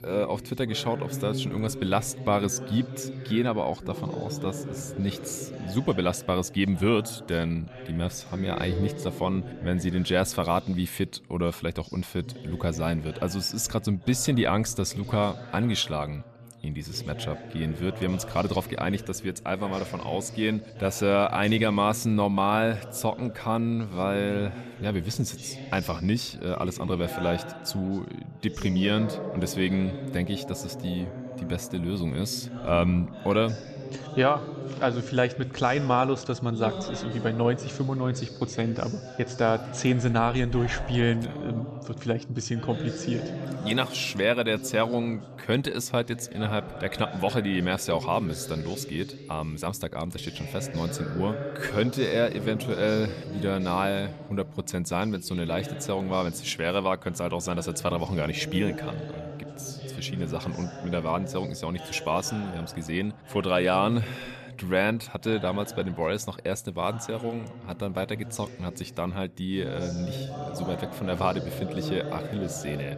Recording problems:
background chatter; noticeable; throughout; 2 voices, 10 dB below the speech

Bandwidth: 14.5 kHz